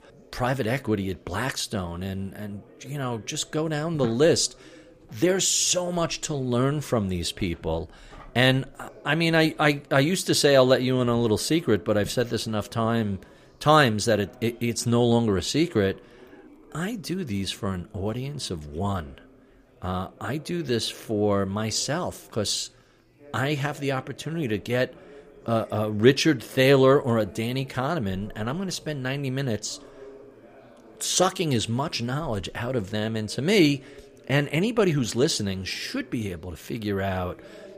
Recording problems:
background chatter; faint; throughout; 4 voices, 25 dB below the speech

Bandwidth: 15 kHz